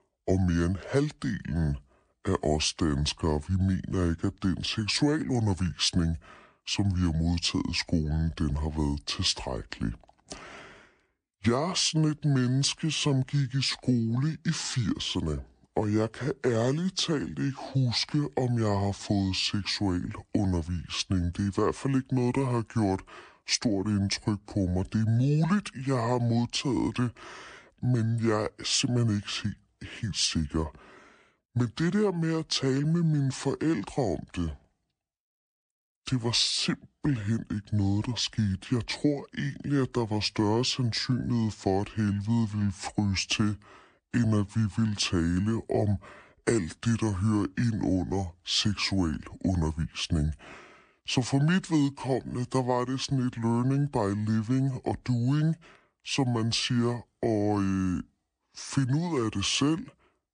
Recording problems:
wrong speed and pitch; too slow and too low; 0.6 times normal speed

